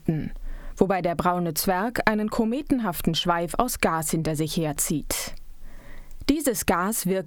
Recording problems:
squashed, flat; heavily

